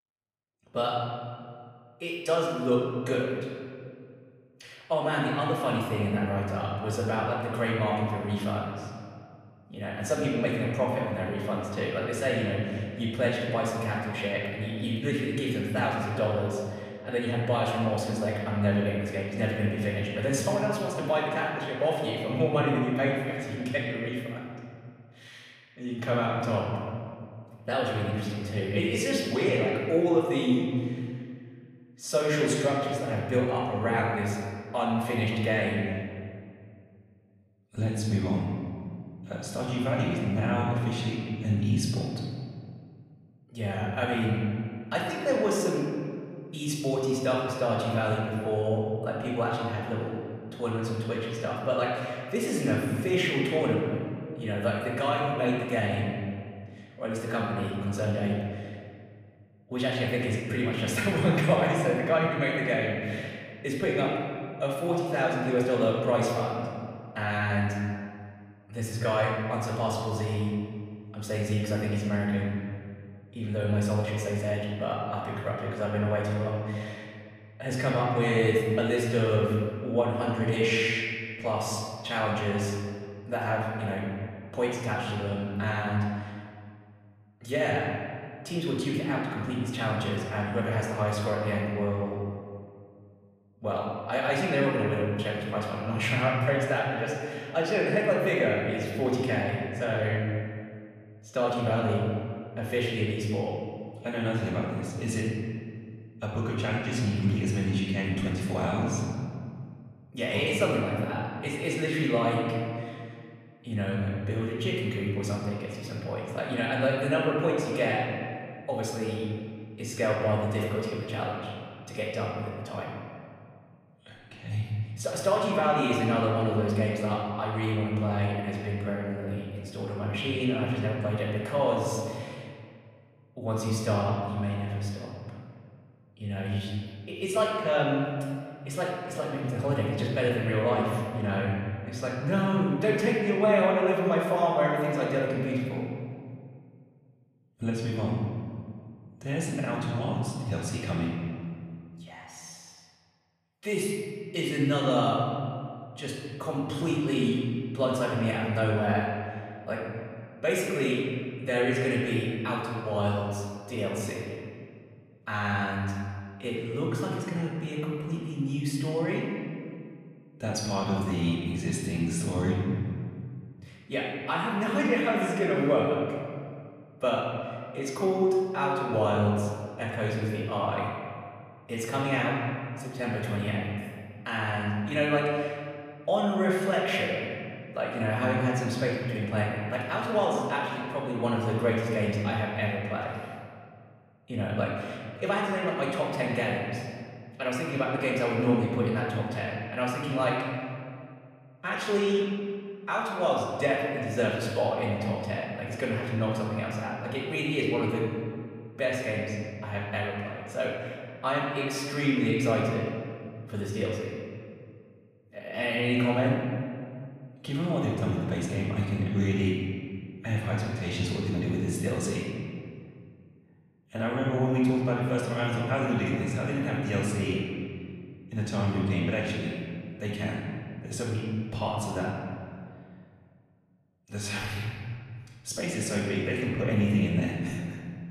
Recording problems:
off-mic speech; far
room echo; noticeable; dies away in 2 s

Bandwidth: 15 kHz